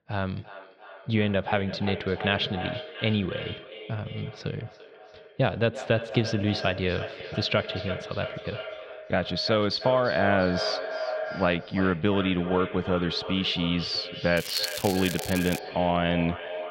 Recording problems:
echo of what is said; strong; throughout; 340 ms later, 9 dB below the speech
muffled; very slightly; fading above 4 kHz
crackling; loud; from 14 to 16 s; 9 dB below the speech

